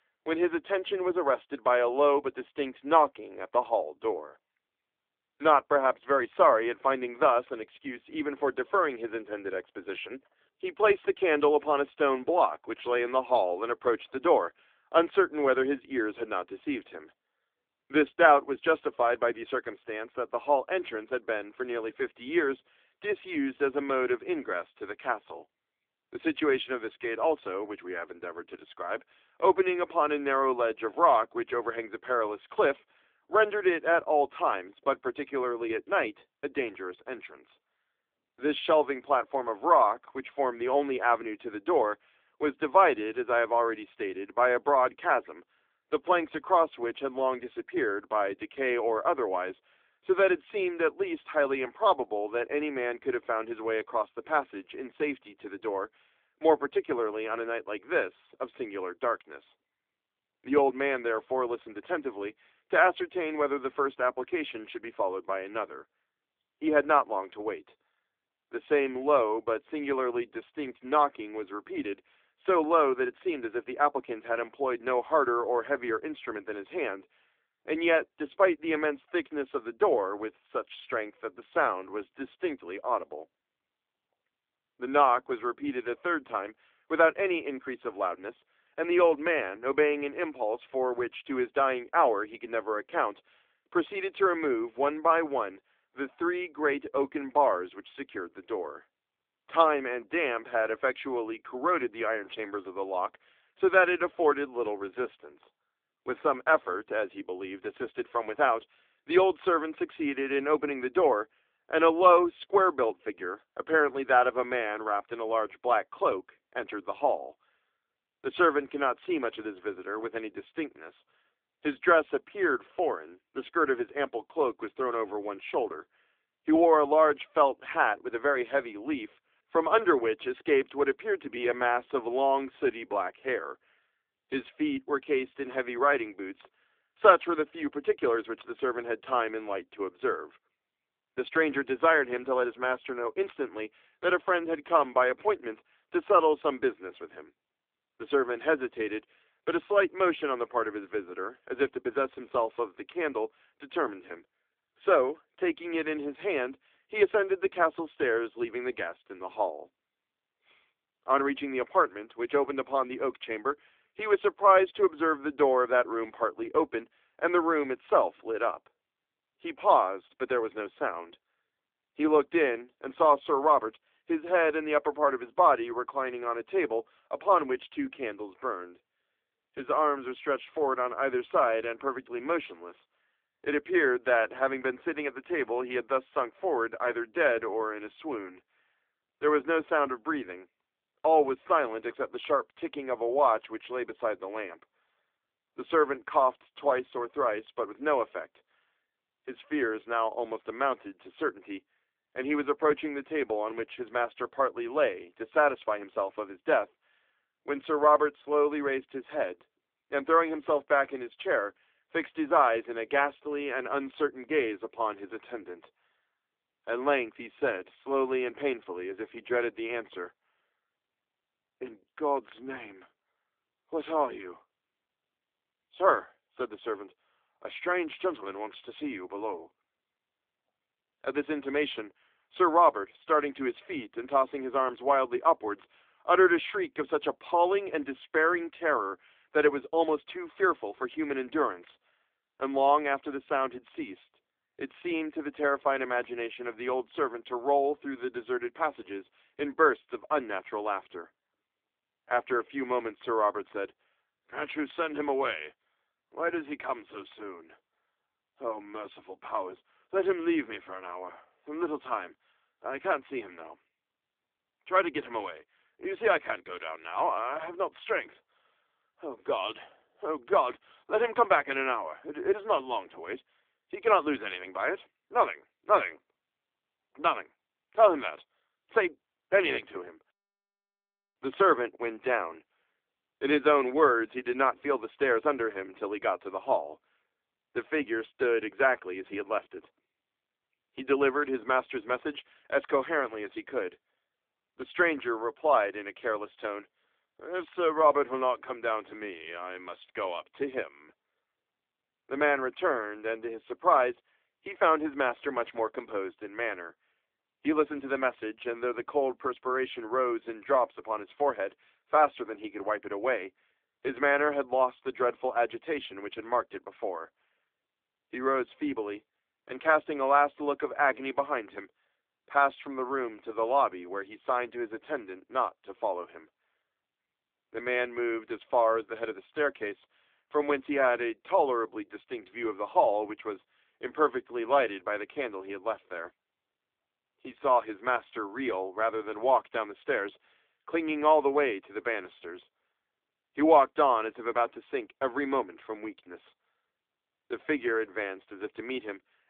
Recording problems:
phone-call audio; nothing above 3.5 kHz

